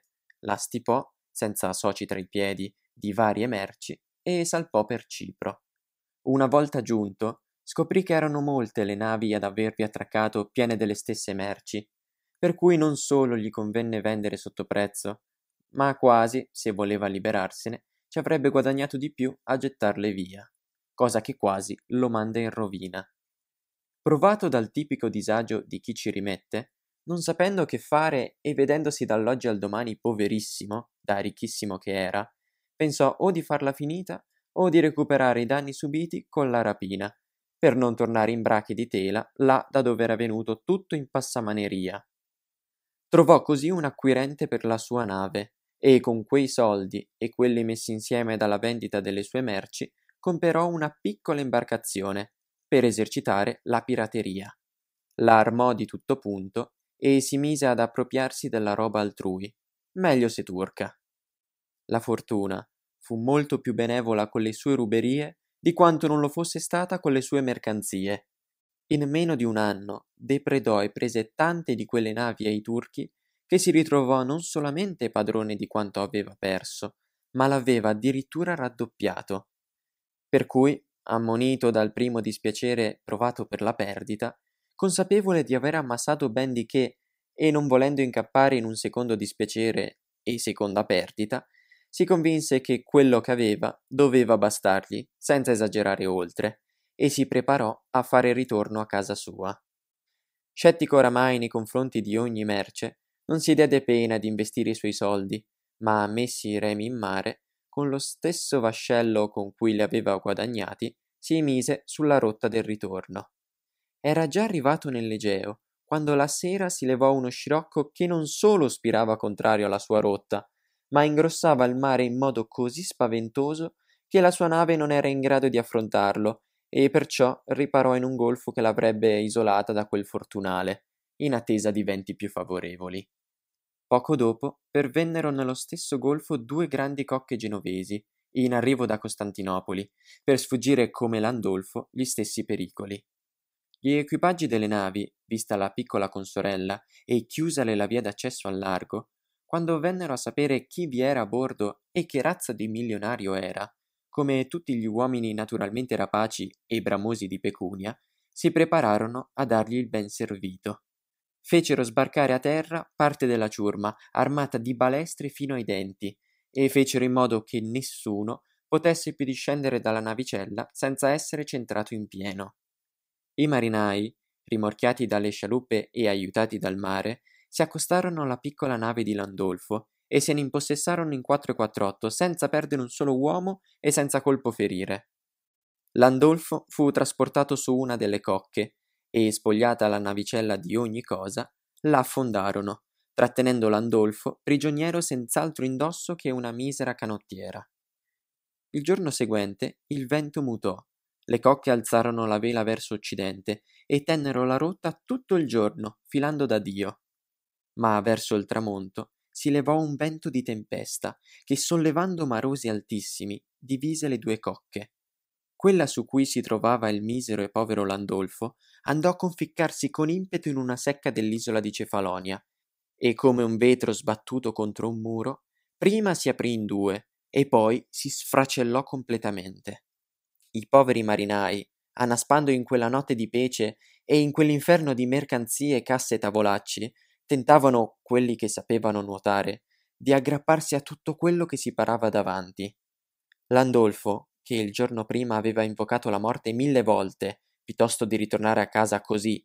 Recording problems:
none

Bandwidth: 15.5 kHz